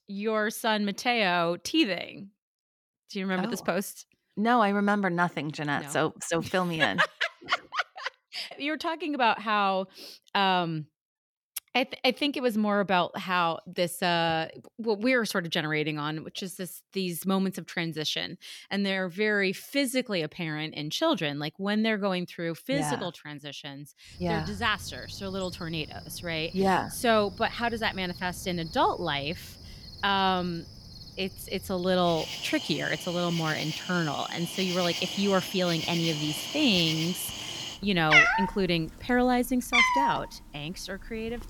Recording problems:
animal sounds; loud; from 24 s on; 1 dB below the speech

